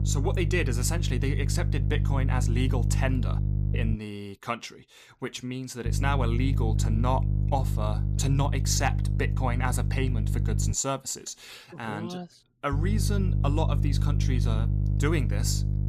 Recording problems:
electrical hum; loud; until 4 s, from 6 to 11 s and from 13 s on; 50 Hz, 8 dB below the speech

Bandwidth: 14.5 kHz